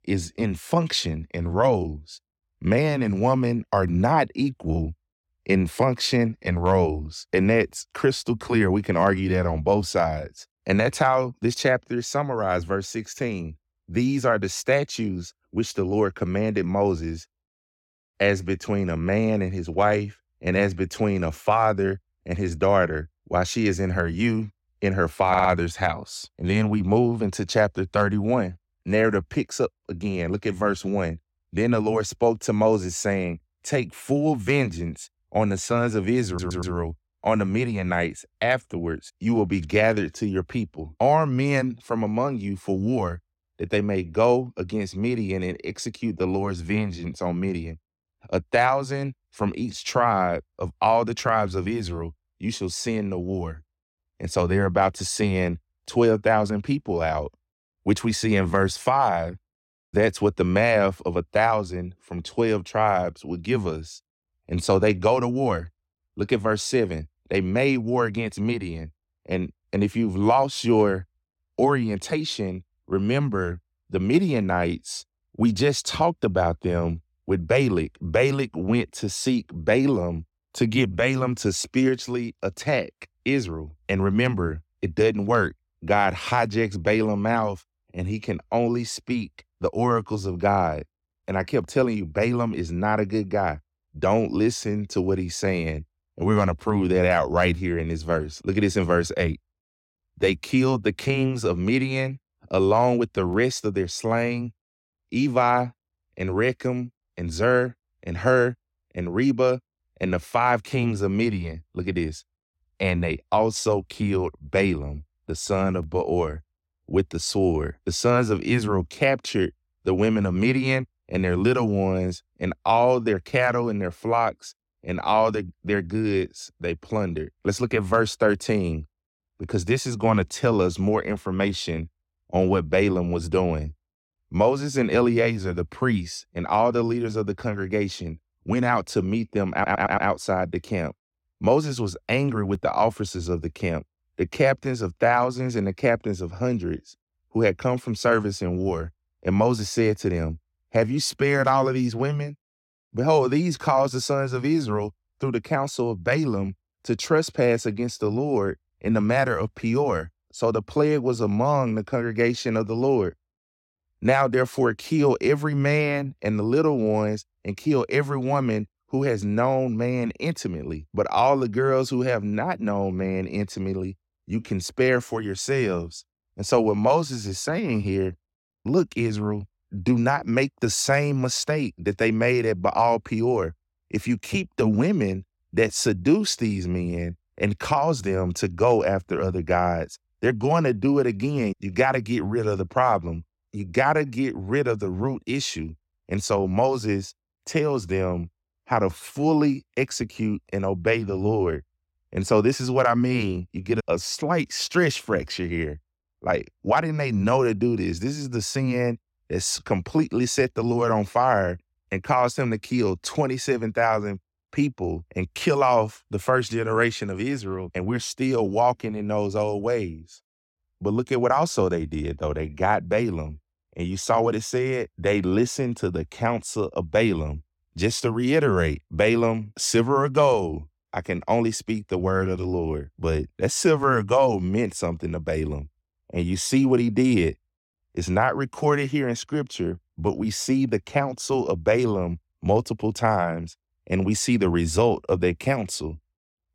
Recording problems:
audio stuttering; at 25 s, at 36 s and at 2:20

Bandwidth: 16.5 kHz